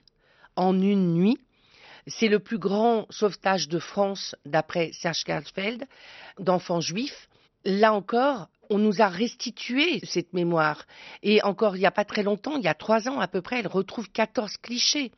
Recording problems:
high frequencies cut off; noticeable; nothing above 6 kHz

